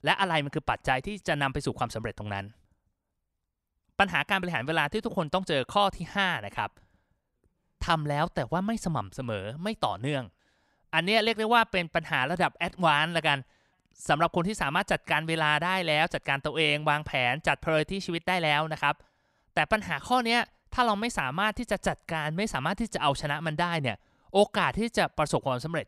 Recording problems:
none

